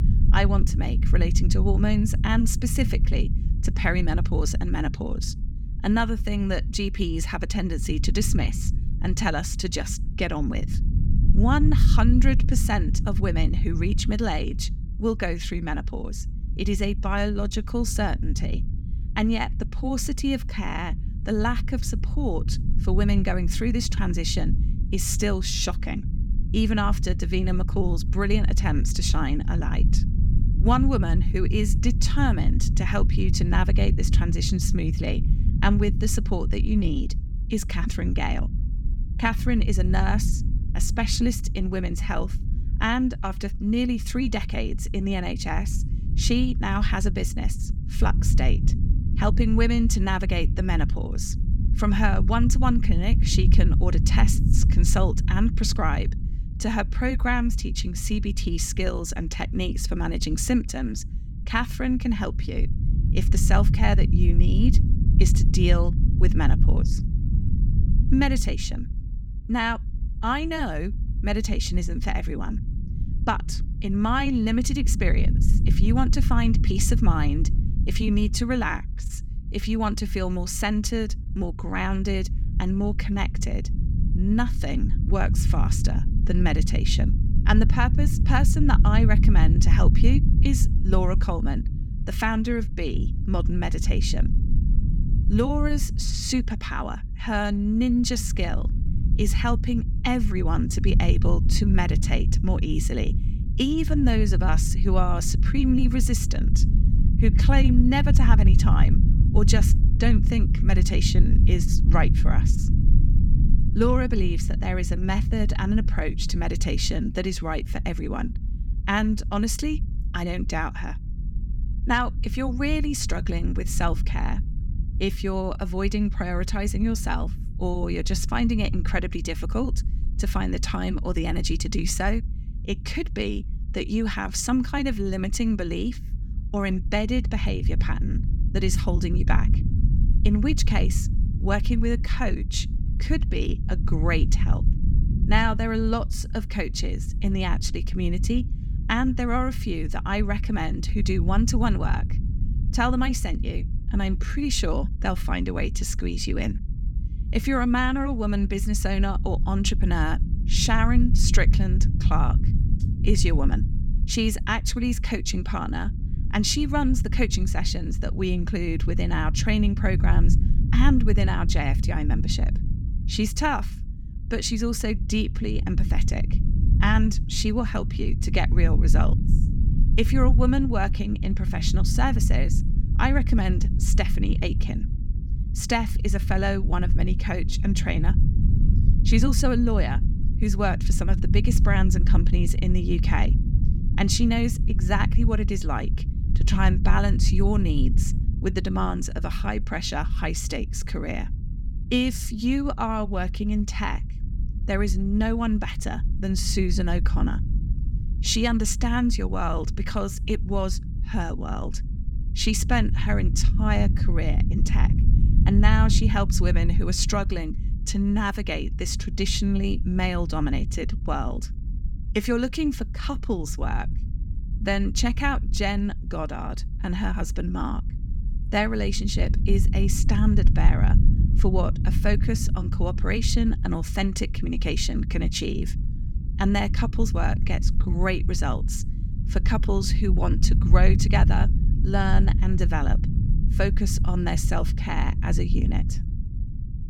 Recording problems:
low rumble; noticeable; throughout; 10 dB below the speech

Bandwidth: 17.5 kHz